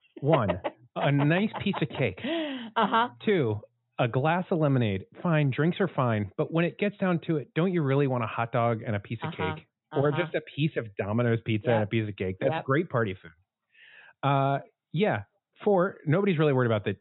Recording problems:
high frequencies cut off; severe; nothing above 4 kHz

